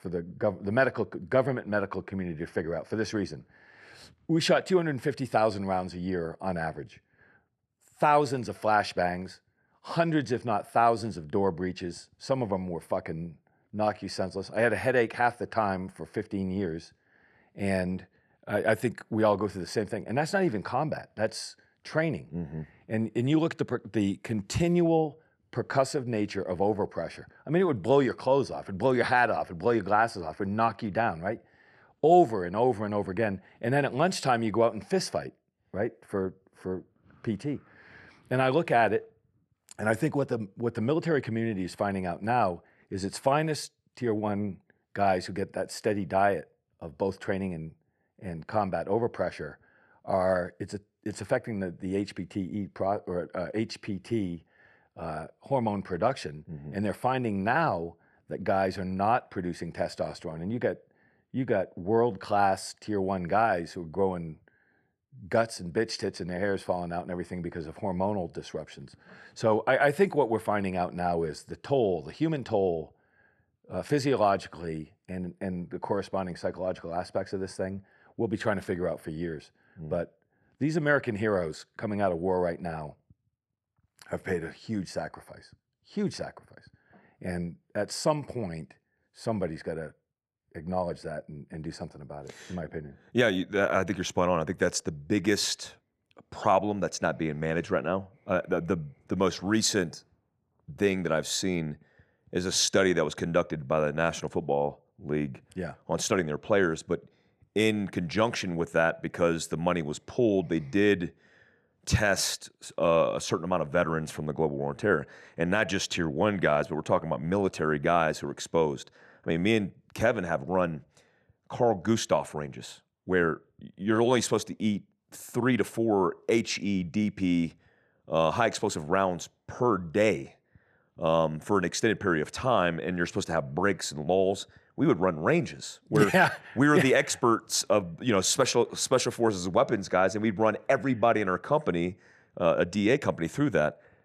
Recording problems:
none

